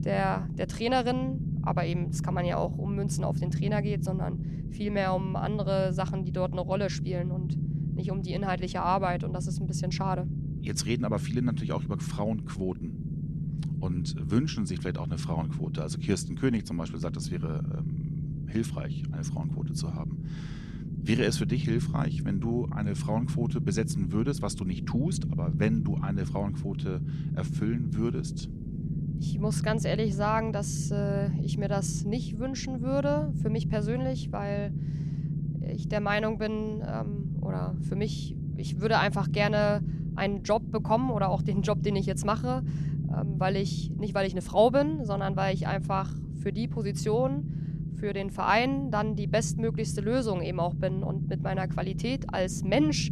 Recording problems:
low rumble; noticeable; throughout; 10 dB below the speech

